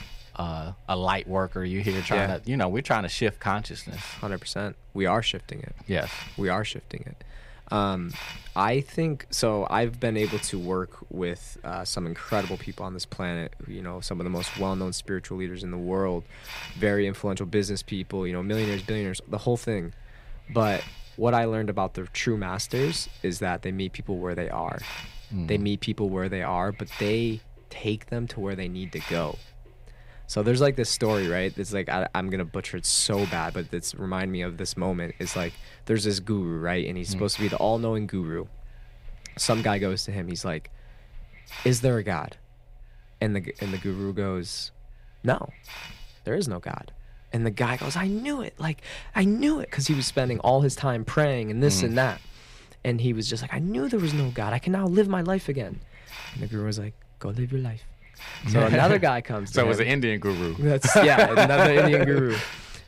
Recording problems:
hiss; noticeable; throughout; 20 dB below the speech

